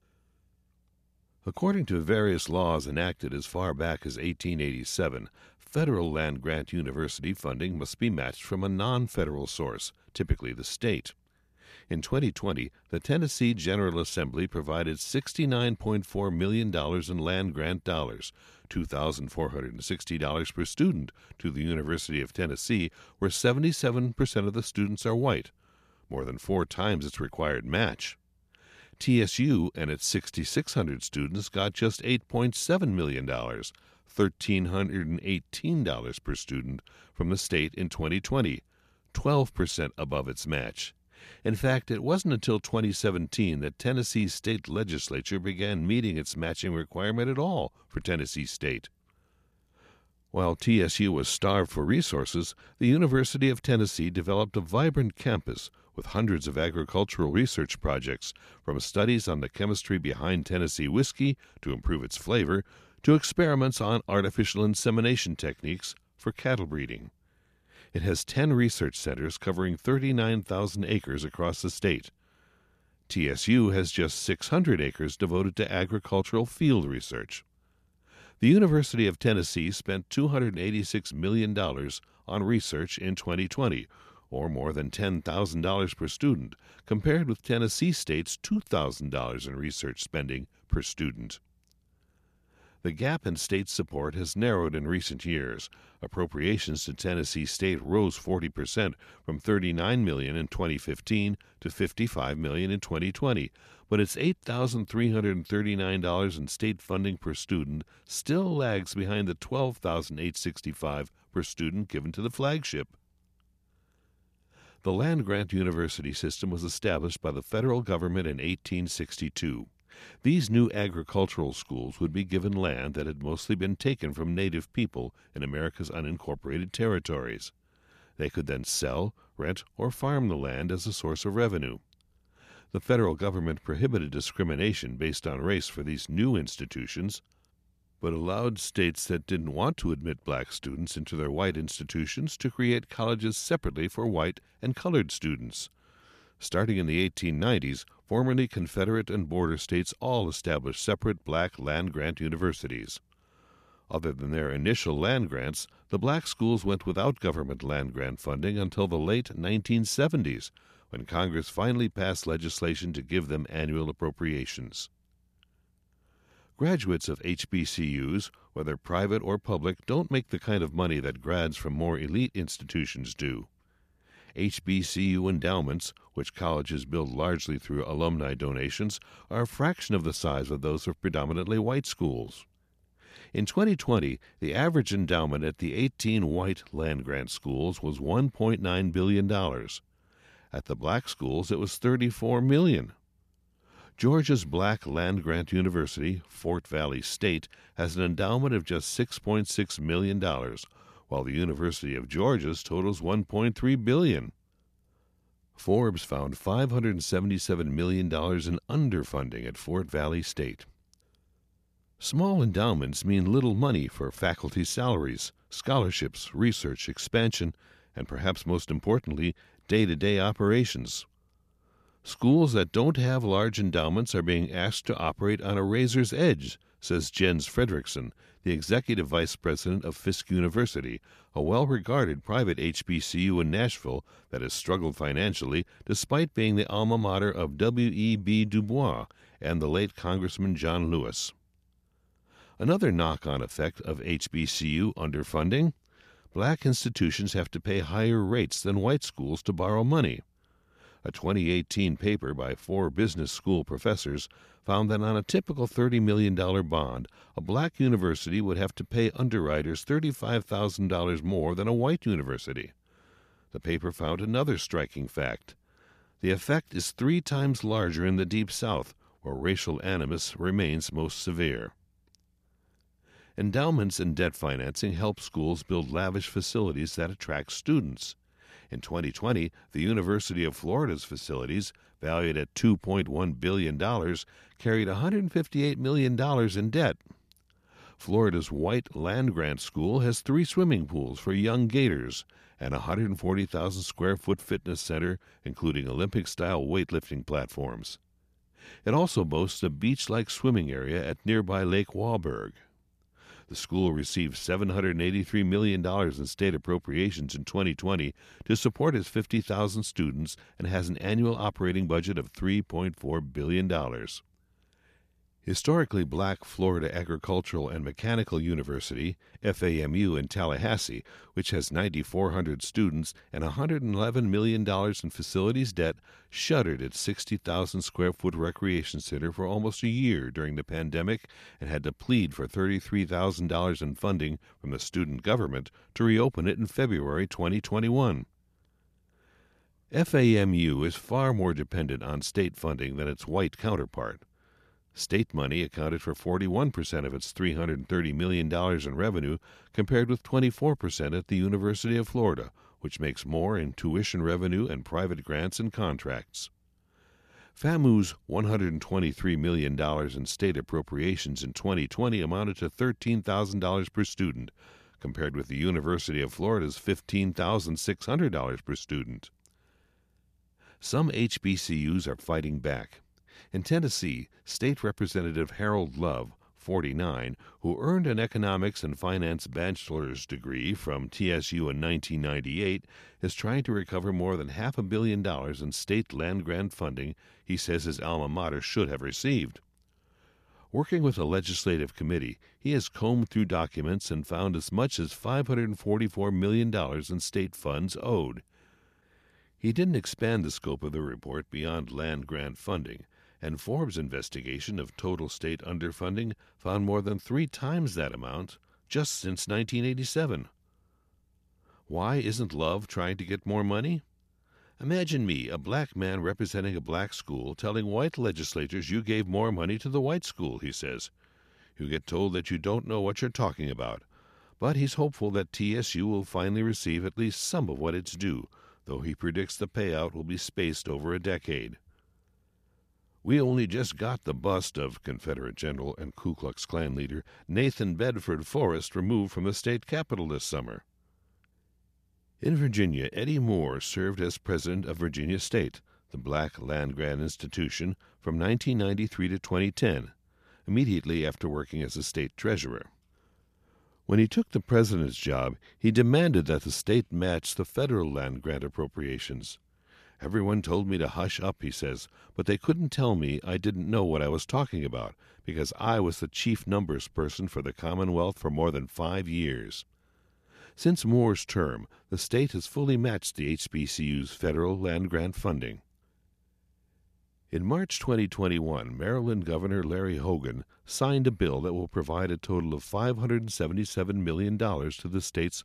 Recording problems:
none

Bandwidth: 14.5 kHz